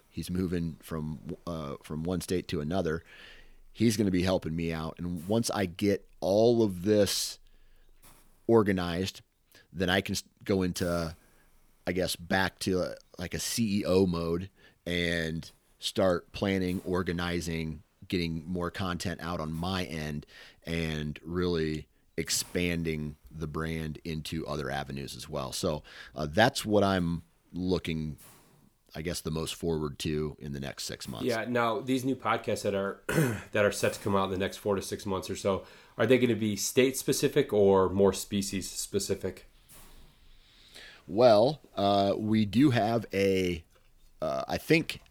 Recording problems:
hiss; faint; throughout; 25 dB below the speech

